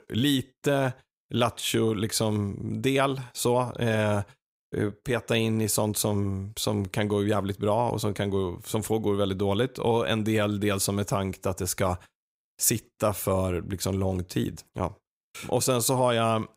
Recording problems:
none

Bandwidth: 15.5 kHz